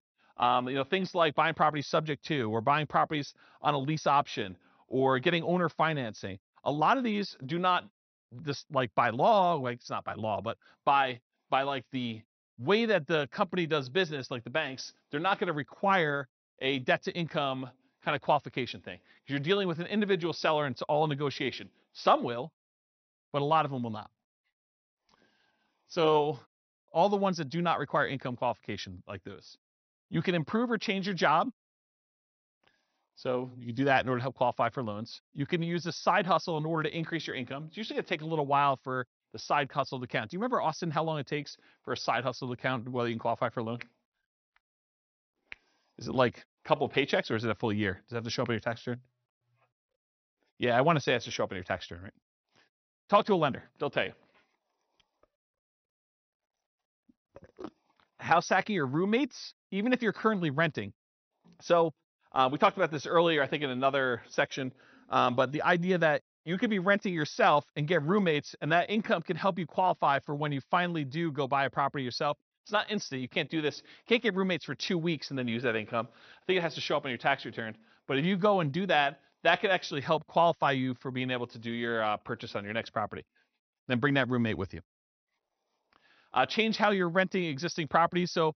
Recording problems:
high frequencies cut off; noticeable; nothing above 6 kHz

